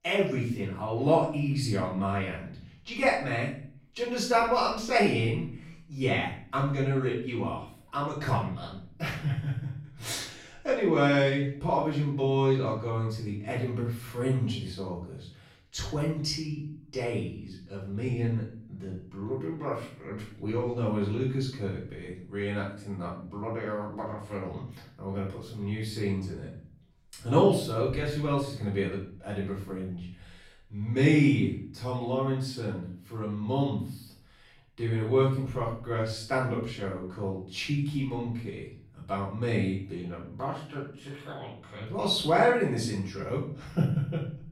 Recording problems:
off-mic speech; far
room echo; noticeable; dies away in 0.5 s

